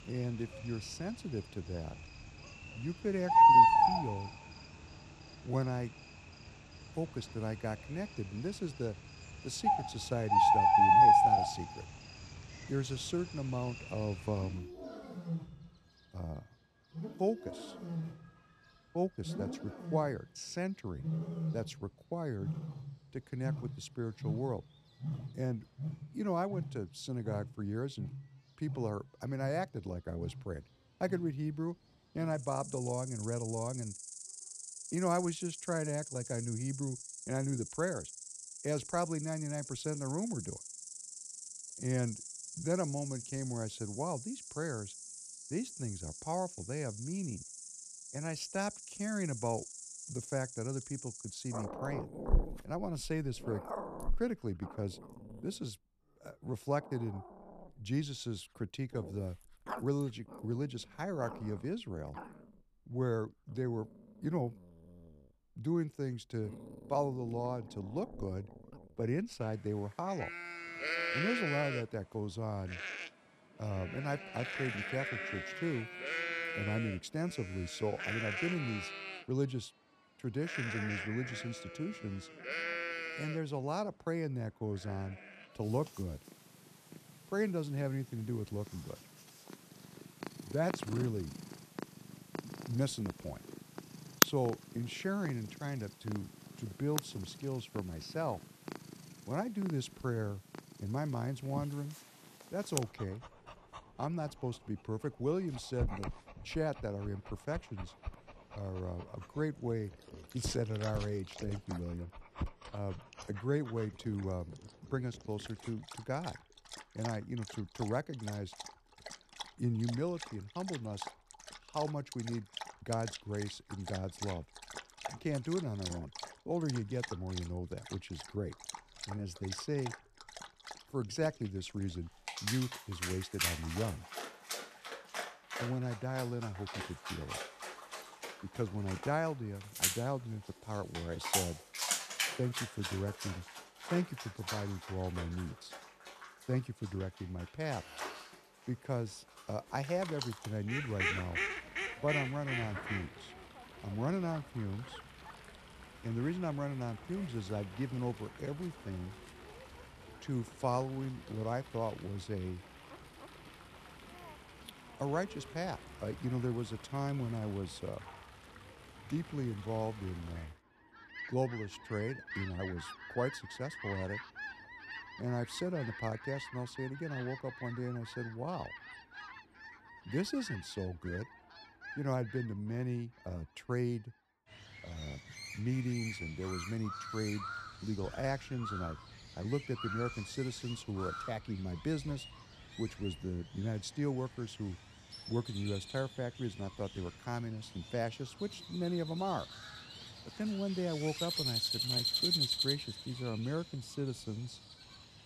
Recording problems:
animal sounds; very loud; throughout; 1 dB above the speech

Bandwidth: 14 kHz